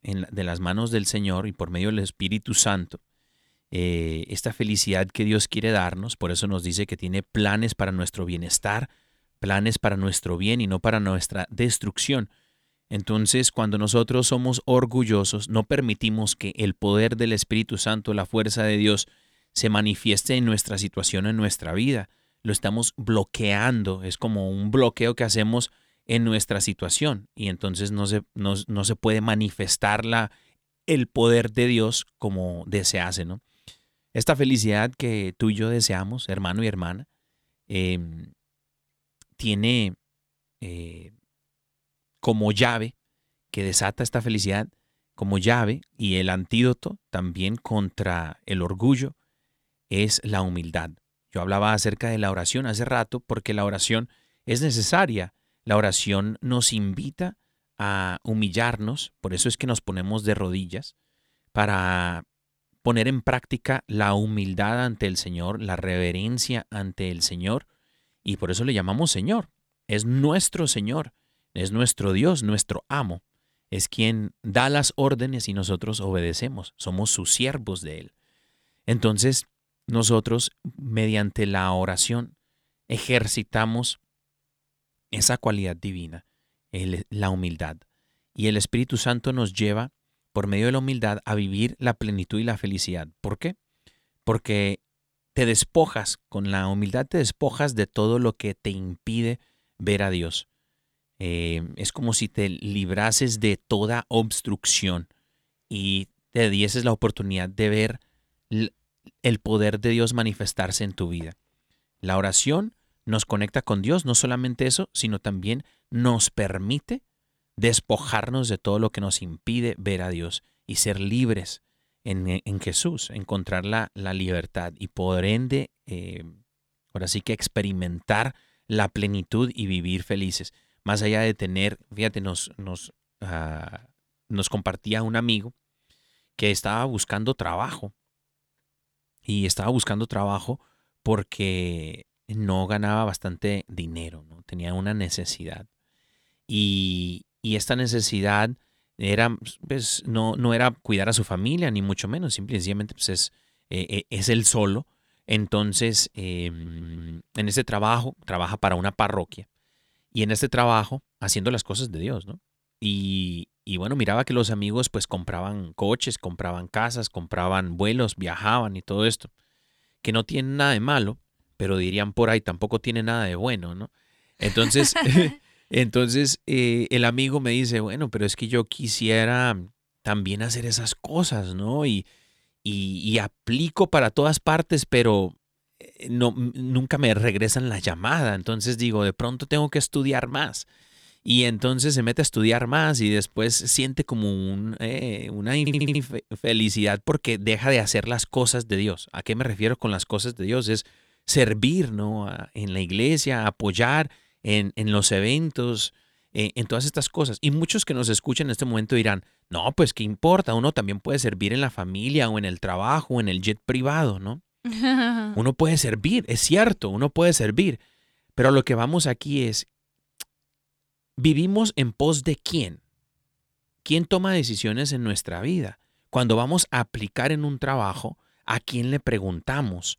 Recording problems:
audio stuttering; at 2:37 and at 3:16

